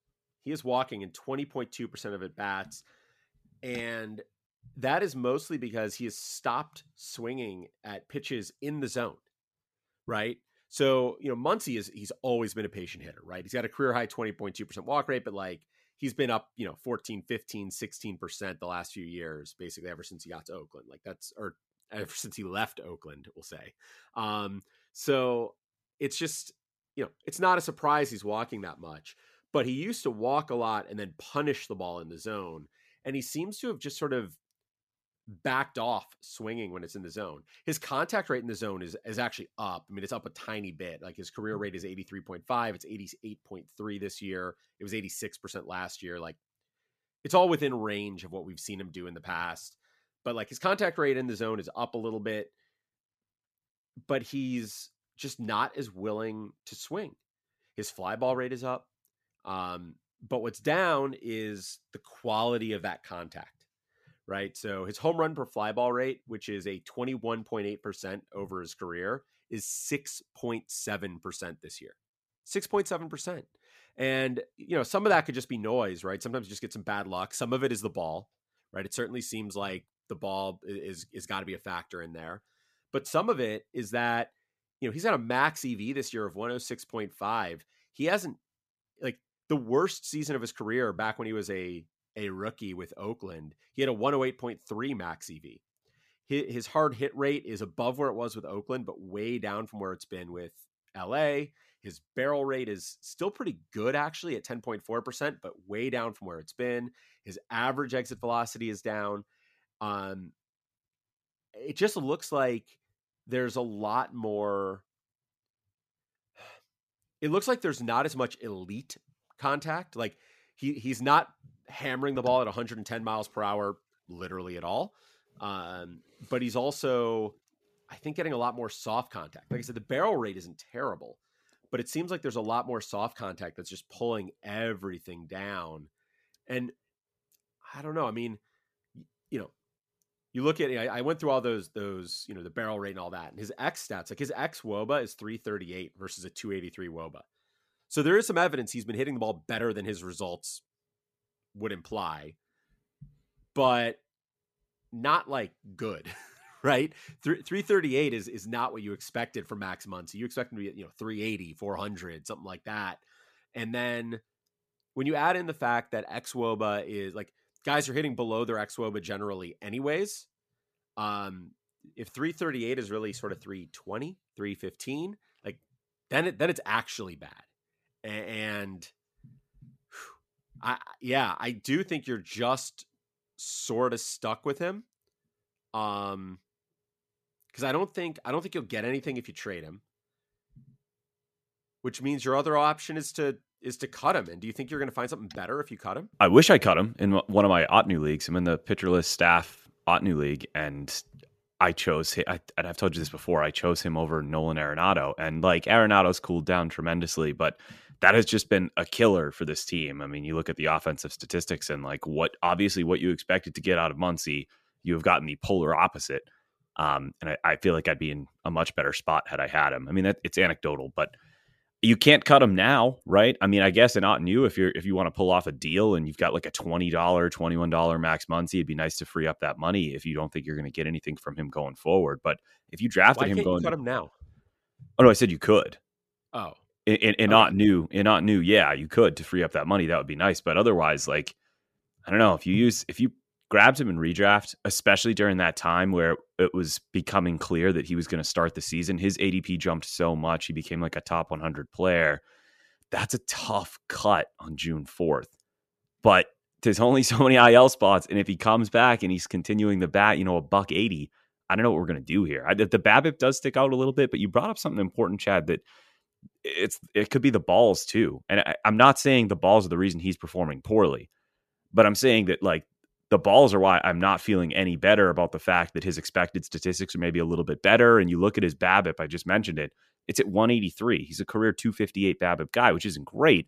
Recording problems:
none

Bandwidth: 14.5 kHz